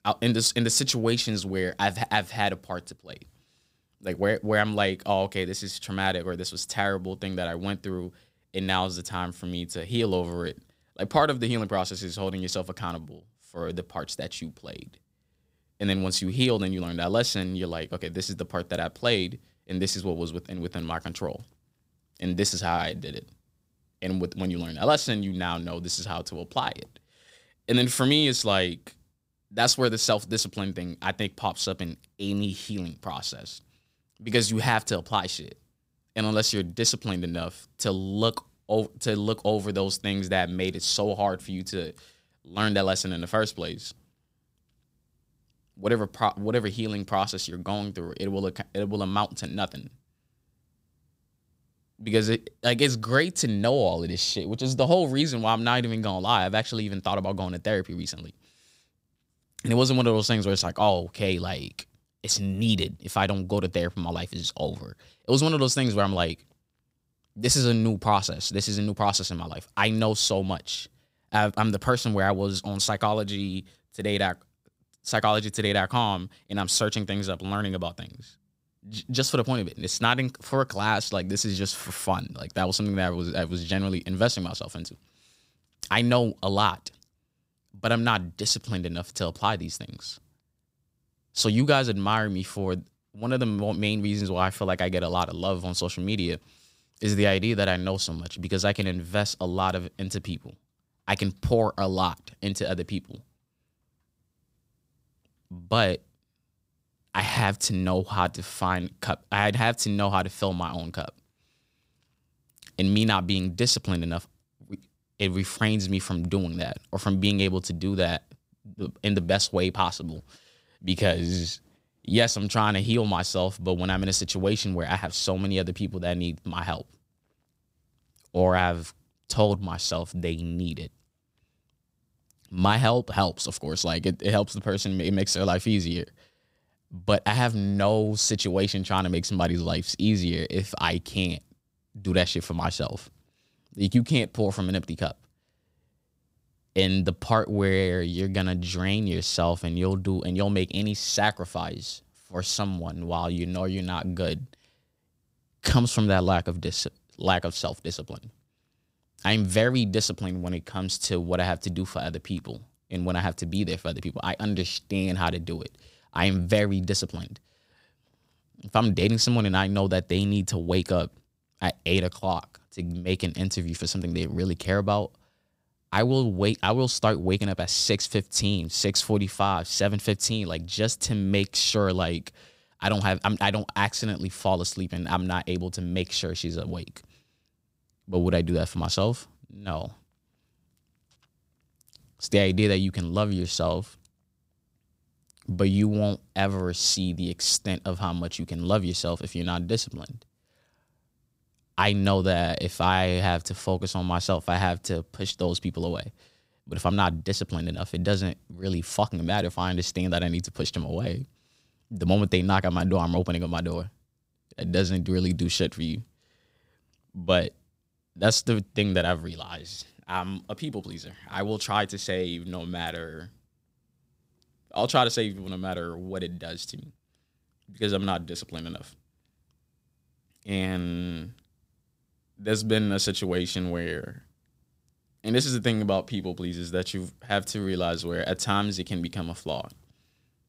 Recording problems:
none

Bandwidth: 15.5 kHz